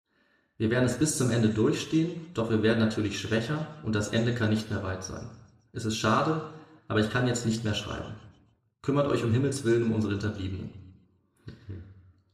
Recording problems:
room echo; slight; dies away in 0.9 s
off-mic speech; somewhat distant

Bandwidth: 14.5 kHz